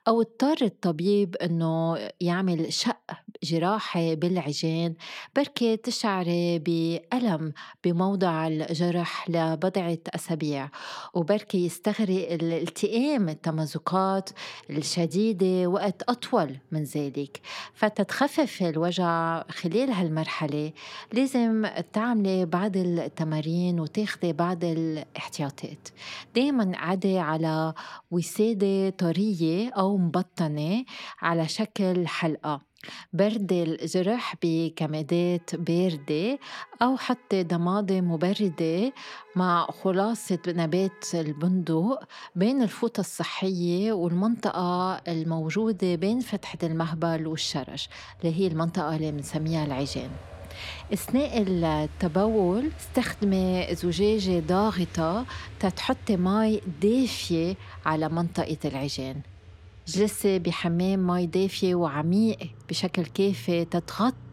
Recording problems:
traffic noise; faint; throughout; 20 dB below the speech

